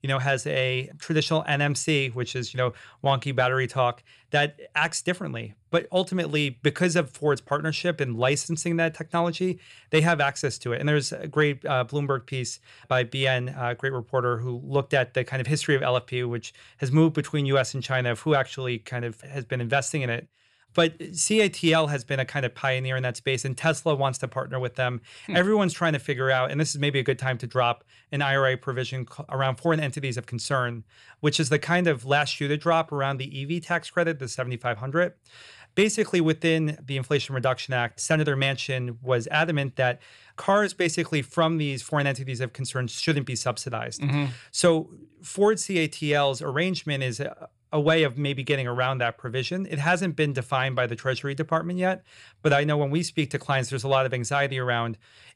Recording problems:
none

